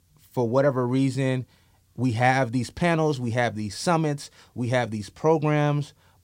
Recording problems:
none

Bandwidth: 16 kHz